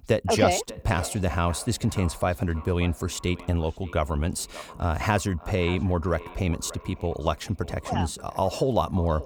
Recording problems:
echo of what is said; faint; throughout; 580 ms later, 20 dB below the speech

